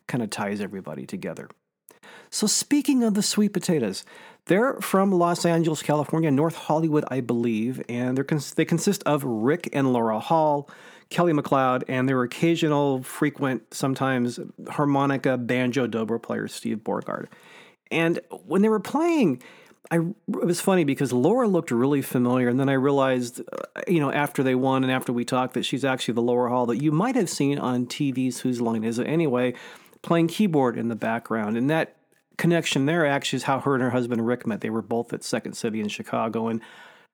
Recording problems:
none

